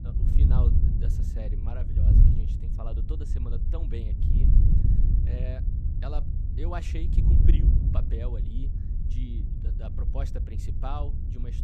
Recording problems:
wind noise on the microphone; heavy; as loud as the speech

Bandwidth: 14.5 kHz